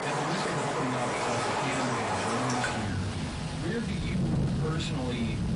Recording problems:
off-mic speech; far
distortion; slight; 10 dB below the speech
room echo; very slight; dies away in 0.2 s
garbled, watery; slightly; nothing above 10.5 kHz
rain or running water; very loud; throughout; 3 dB above the speech

